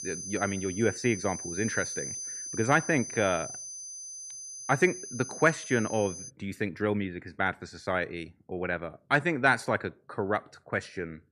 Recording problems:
high-pitched whine; loud; until 6.5 s; 6 kHz, 8 dB below the speech

